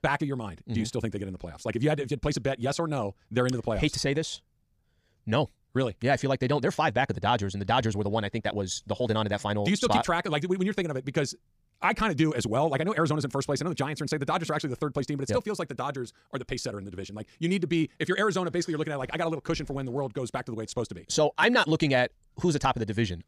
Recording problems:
wrong speed, natural pitch; too fast; 1.6 times normal speed

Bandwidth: 15 kHz